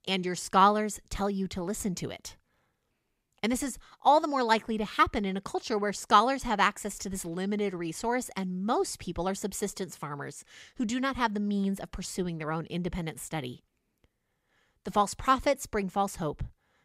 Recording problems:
none

